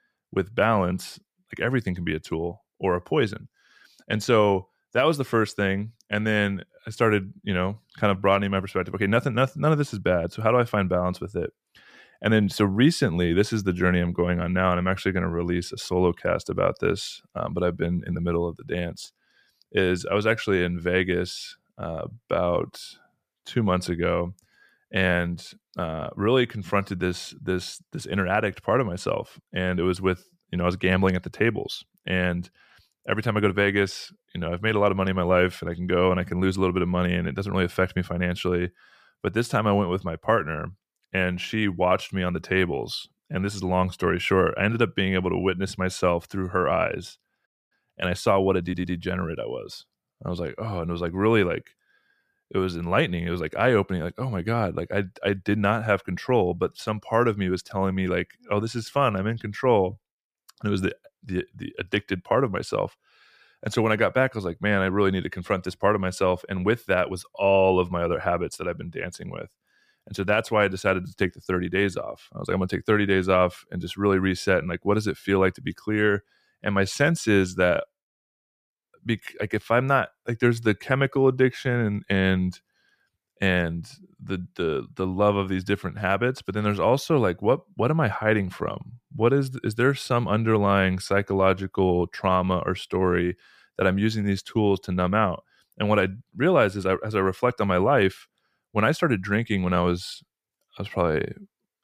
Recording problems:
audio stuttering; at 49 s

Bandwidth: 15 kHz